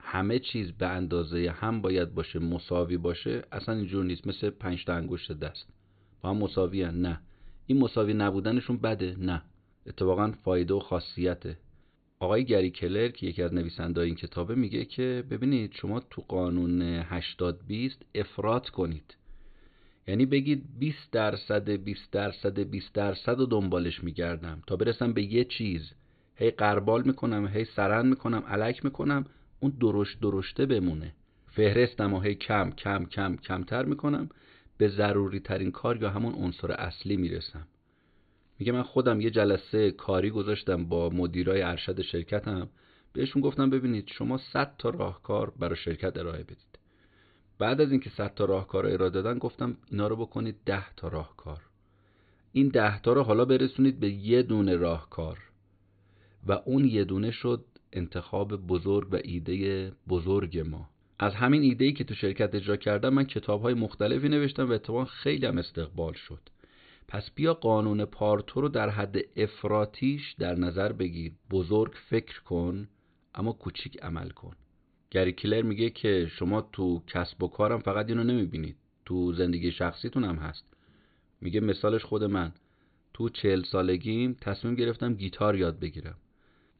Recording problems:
high frequencies cut off; severe; nothing above 4.5 kHz

